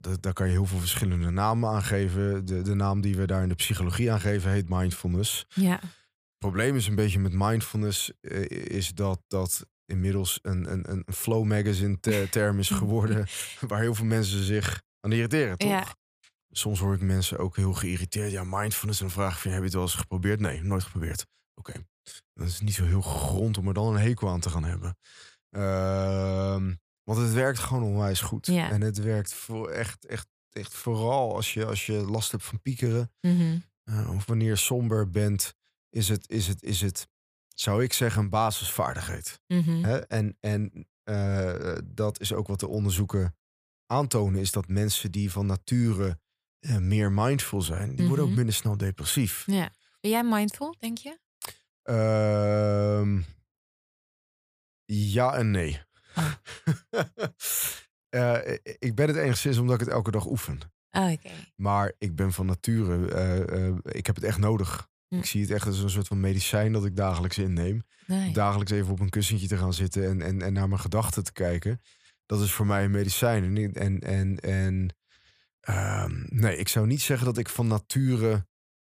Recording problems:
none

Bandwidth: 15 kHz